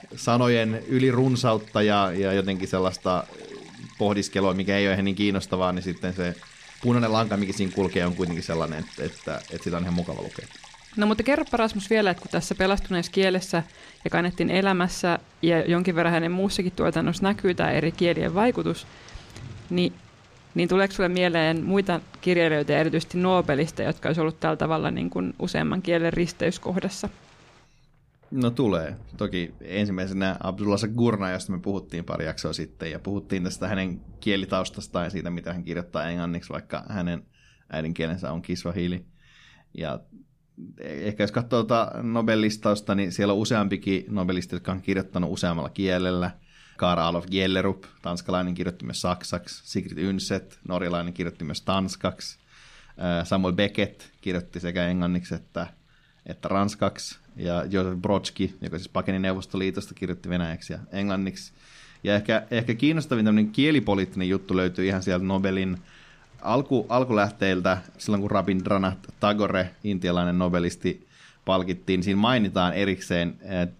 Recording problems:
rain or running water; faint; throughout; 25 dB below the speech

